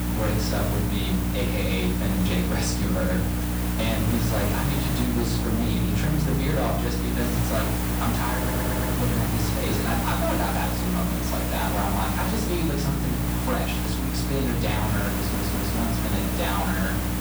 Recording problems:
off-mic speech; far
room echo; noticeable; dies away in 0.5 s
distortion; slight; 11% of the sound clipped
electrical hum; loud; throughout; 60 Hz, 7 dB below the speech
hiss; loud; throughout; 2 dB below the speech
audio stuttering; at 8.5 s and at 15 s

